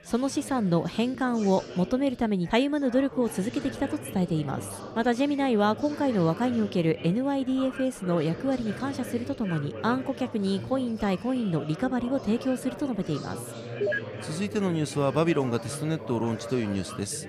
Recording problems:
chatter from many people; noticeable; throughout; 10 dB below the speech

